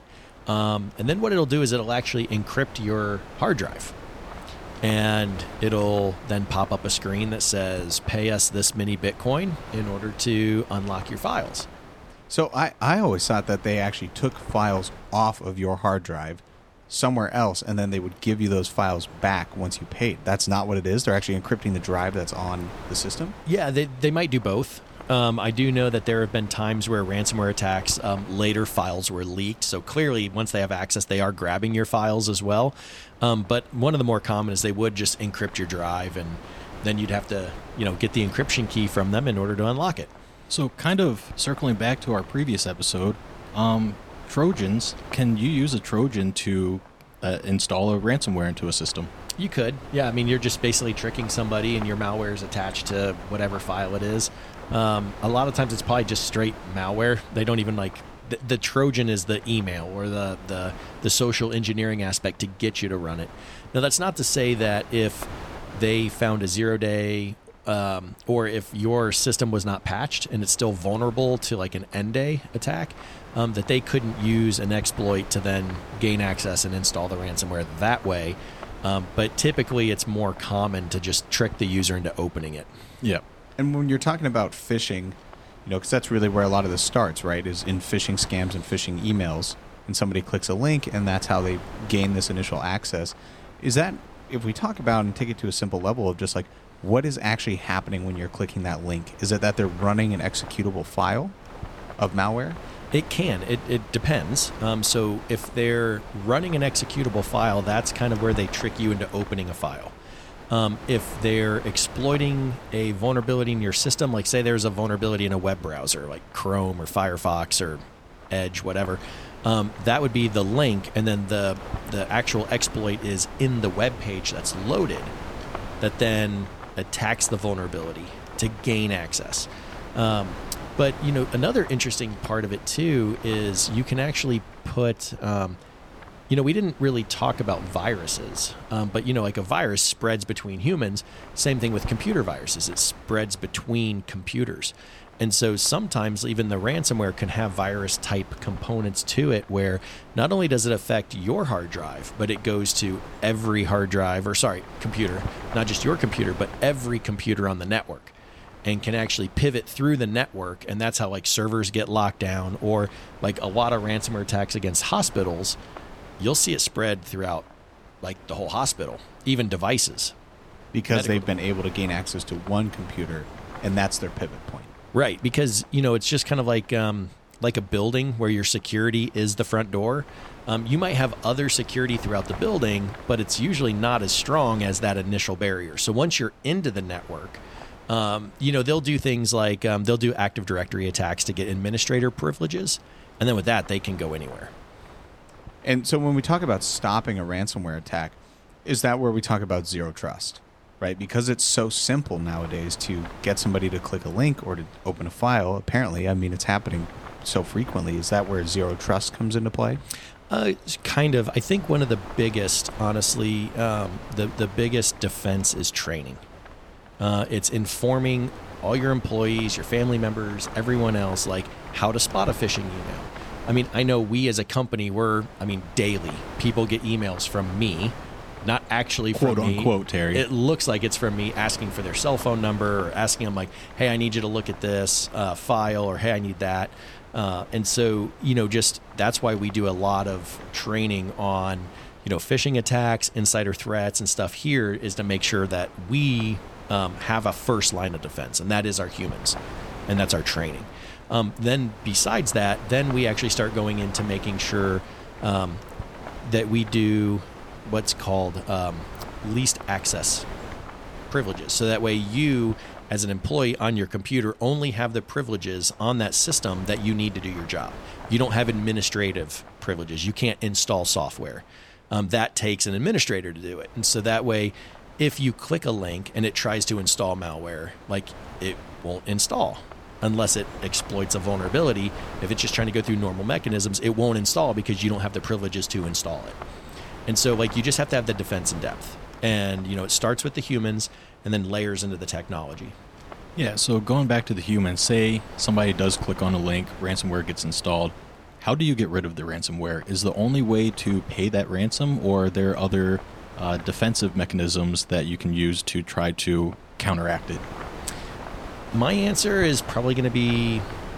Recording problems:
wind noise on the microphone; occasional gusts; 15 dB below the speech

